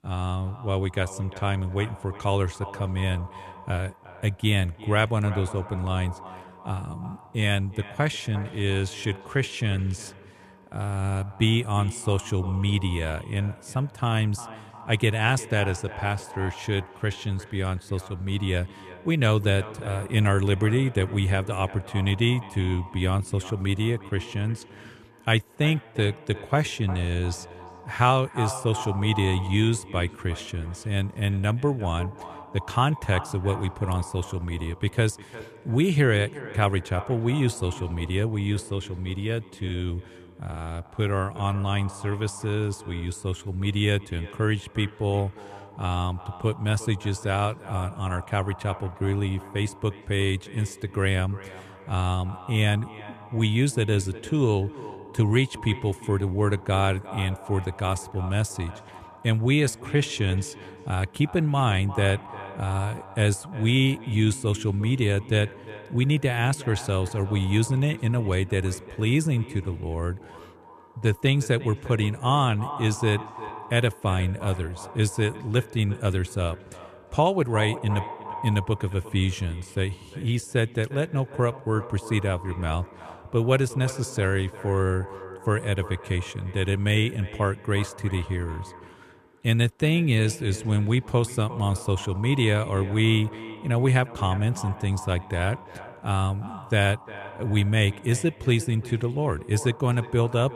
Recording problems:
echo of what is said; noticeable; throughout; 350 ms later, 15 dB below the speech

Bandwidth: 13.5 kHz